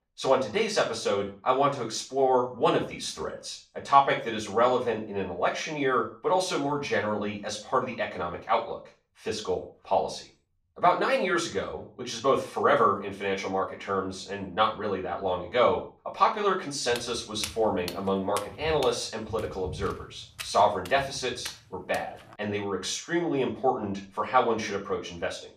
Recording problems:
off-mic speech; far
room echo; slight; dies away in 0.3 s
footsteps; noticeable; from 17 to 22 s; peak 10 dB below the speech

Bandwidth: 14.5 kHz